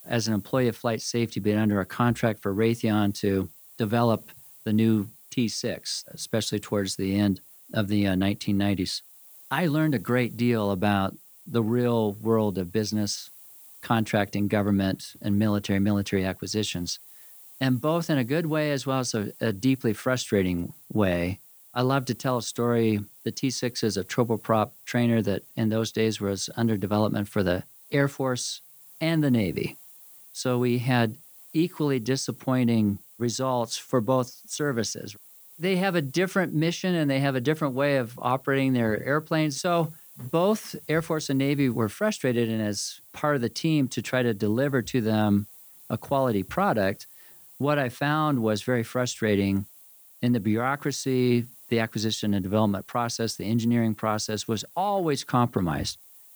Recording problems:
hiss; faint; throughout; 20 dB below the speech

